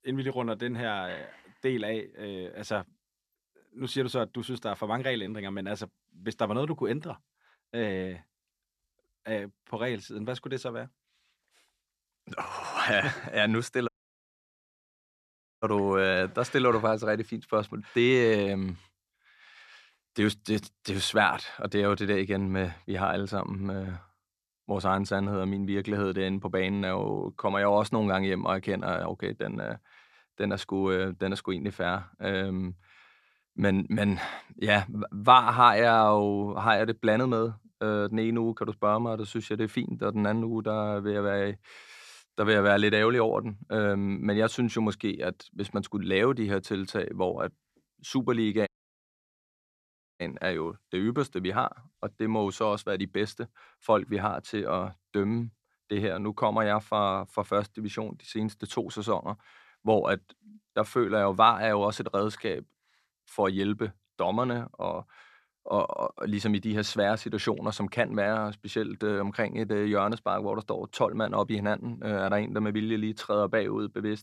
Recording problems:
audio cutting out; at 14 s for 1.5 s and at 49 s for 1.5 s

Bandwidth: 13.5 kHz